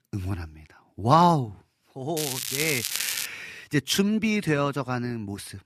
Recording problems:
crackling; loud; from 2 to 3.5 s; 3 dB below the speech

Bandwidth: 14.5 kHz